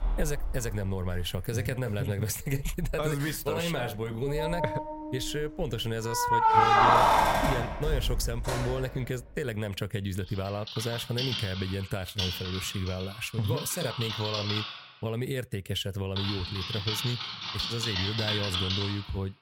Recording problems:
household noises; very loud; throughout; 3 dB above the speech

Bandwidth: 16 kHz